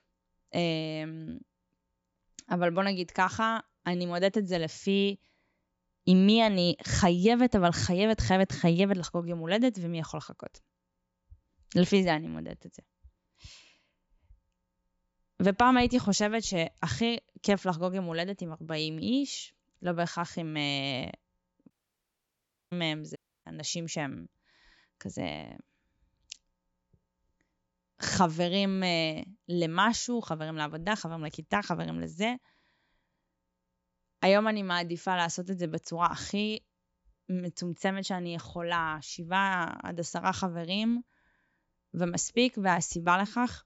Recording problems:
high frequencies cut off; noticeable; nothing above 8 kHz
audio cutting out; at 22 s for 1 s and at 23 s

